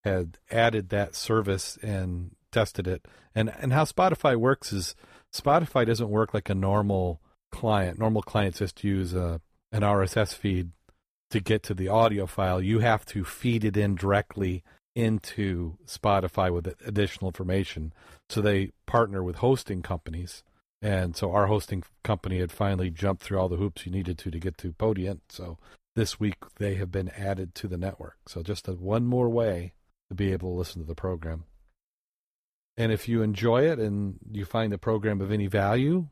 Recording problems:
none

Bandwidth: 14.5 kHz